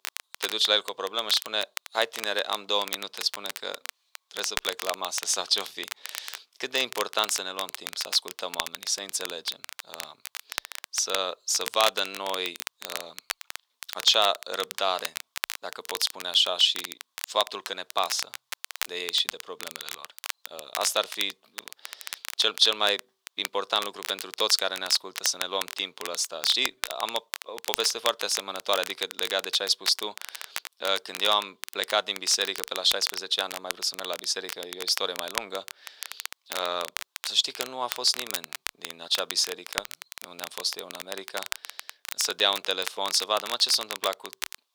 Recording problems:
thin; very; fading below 500 Hz
crackle, like an old record; loud; 10 dB below the speech

